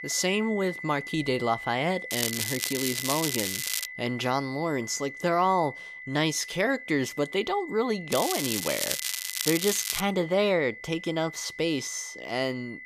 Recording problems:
crackling; loud; from 2 to 4 s and from 8 to 10 s; 1 dB below the speech
high-pitched whine; noticeable; throughout; 2 kHz, 10 dB below the speech

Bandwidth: 14.5 kHz